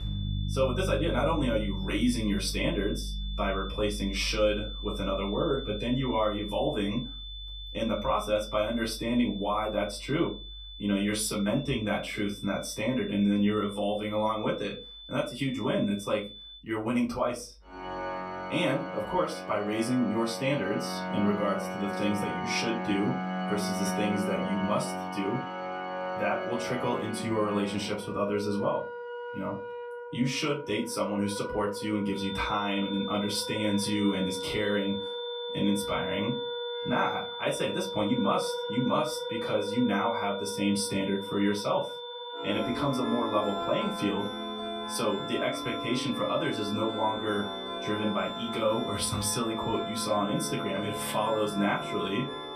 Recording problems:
off-mic speech; far
room echo; very slight; dies away in 0.2 s
high-pitched whine; loud; until 17 s and from 32 s on; 3.5 kHz, 10 dB below the speech
background music; loud; throughout; 6 dB below the speech

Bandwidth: 14.5 kHz